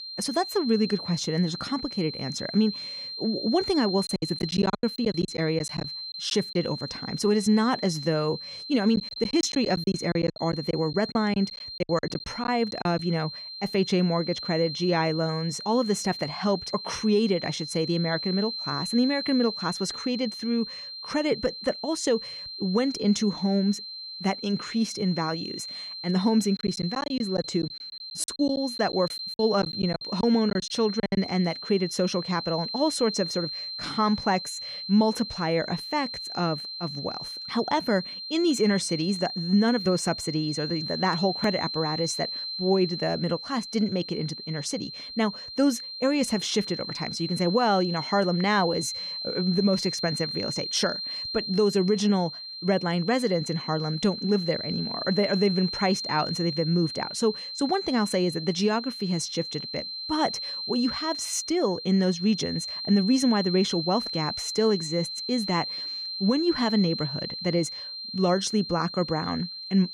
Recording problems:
high-pitched whine; loud; throughout; 4 kHz, 6 dB below the speech
choppy; very; from 4 to 6.5 s, from 9 to 13 s and from 27 to 31 s; 17% of the speech affected

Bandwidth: 15.5 kHz